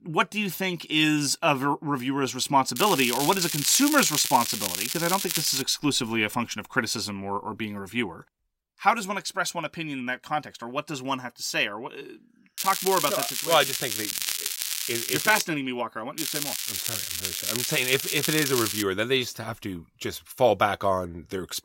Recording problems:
crackling; loud; from 3 to 5.5 s, from 13 to 15 s and from 16 to 19 s; 2 dB below the speech

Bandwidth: 16 kHz